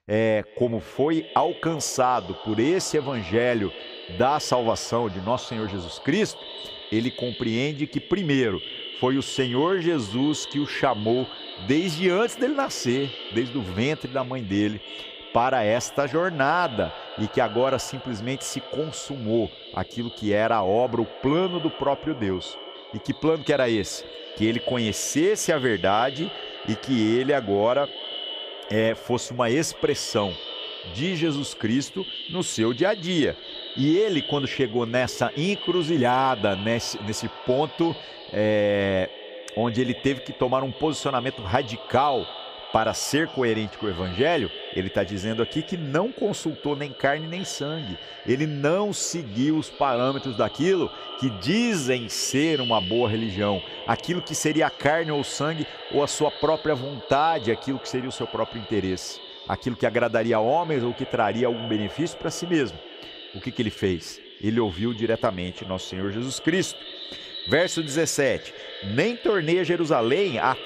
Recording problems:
echo of what is said; strong; throughout; 330 ms later, 10 dB below the speech

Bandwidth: 15 kHz